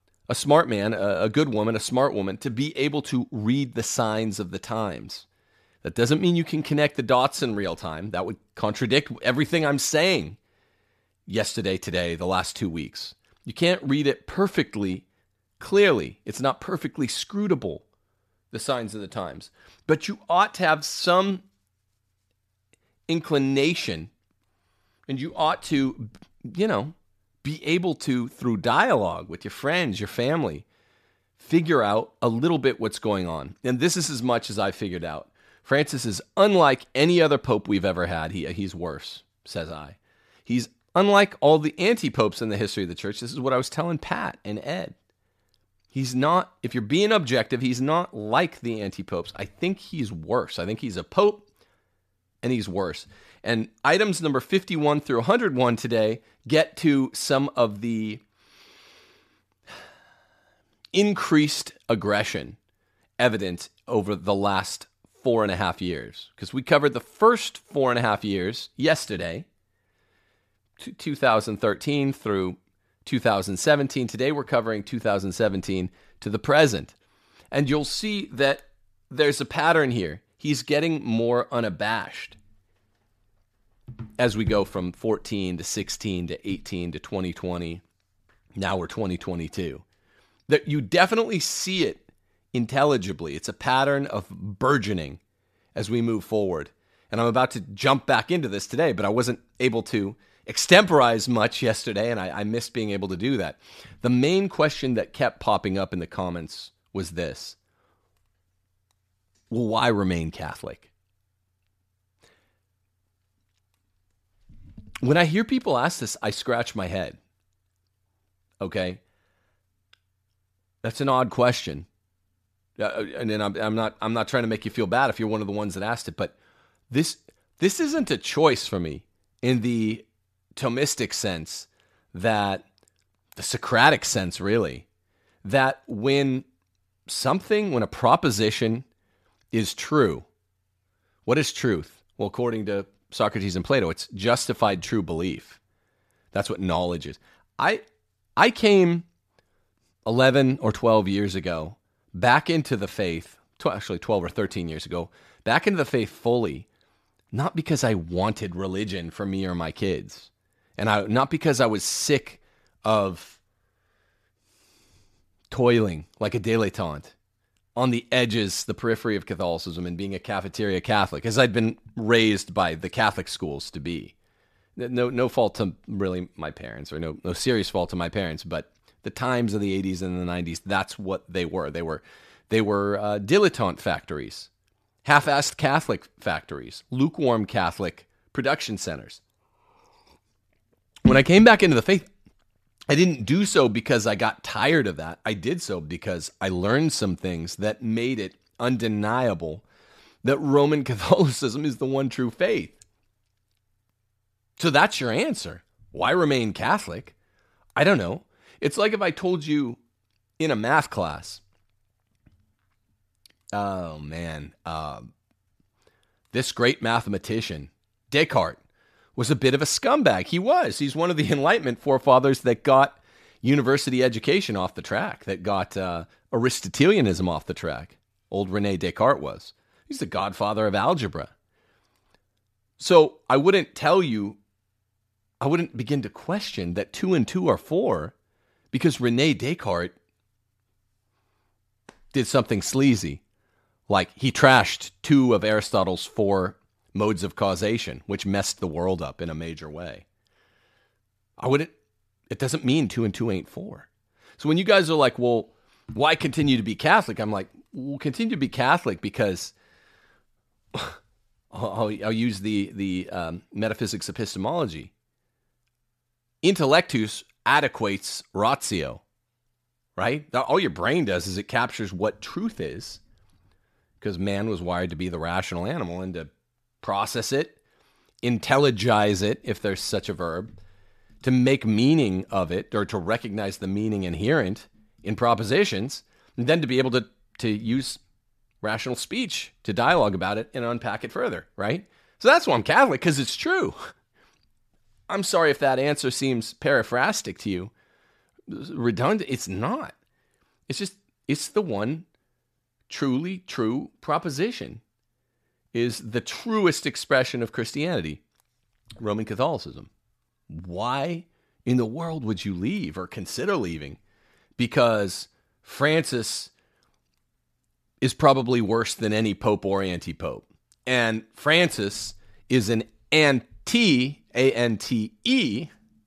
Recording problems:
none

